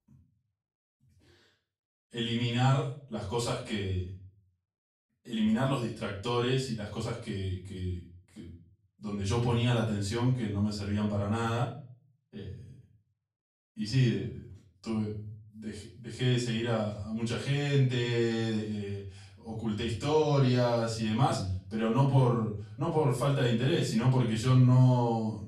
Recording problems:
off-mic speech; far
room echo; noticeable; dies away in 0.4 s

